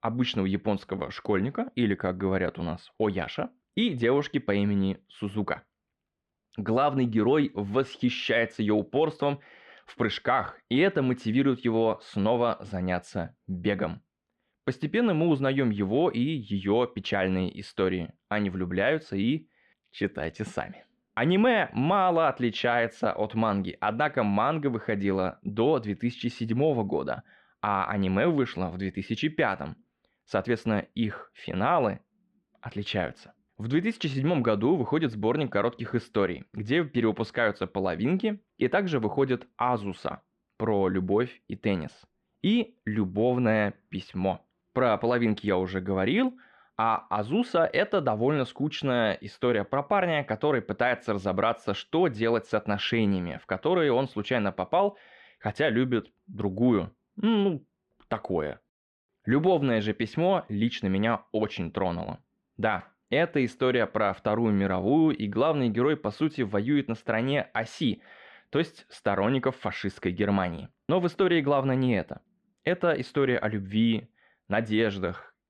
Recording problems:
muffled; slightly; fading above 2.5 kHz

